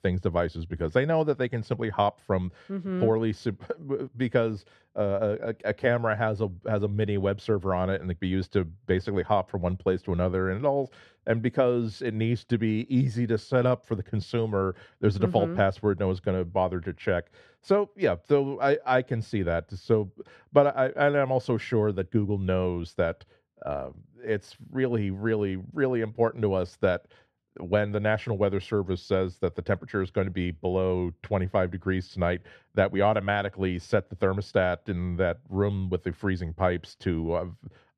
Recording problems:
muffled; slightly; fading above 2 kHz

